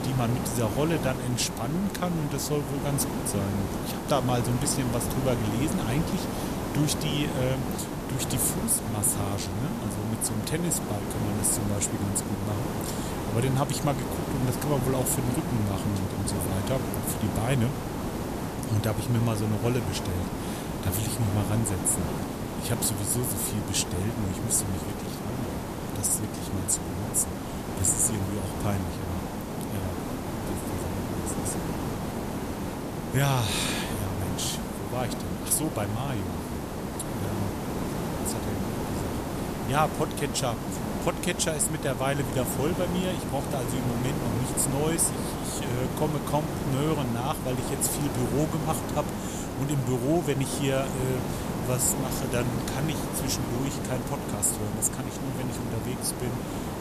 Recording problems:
hiss; loud; throughout; 3 dB below the speech

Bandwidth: 14.5 kHz